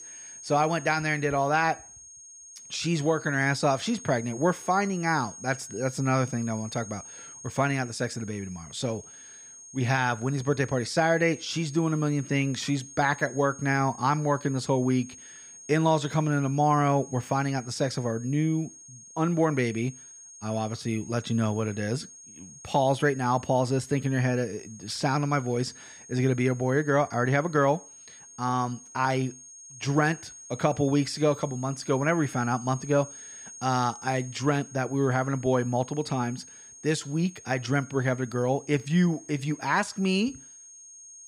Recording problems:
high-pitched whine; noticeable; throughout; 6.5 kHz, 15 dB below the speech

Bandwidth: 15 kHz